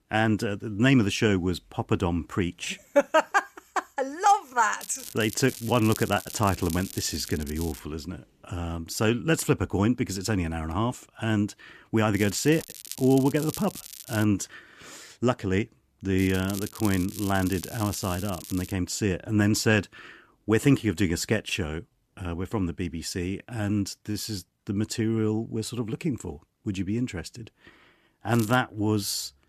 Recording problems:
crackling; noticeable; 4 times, first at 5 s; 15 dB below the speech

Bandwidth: 14.5 kHz